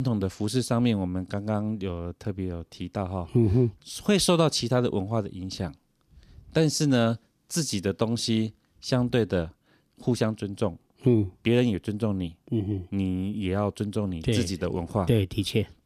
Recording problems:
abrupt cut into speech; at the start

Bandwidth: 14.5 kHz